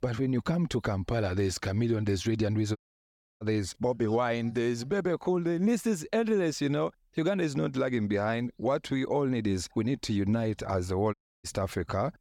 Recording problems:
audio cutting out; at 3 s for 0.5 s and at 11 s

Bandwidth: 17.5 kHz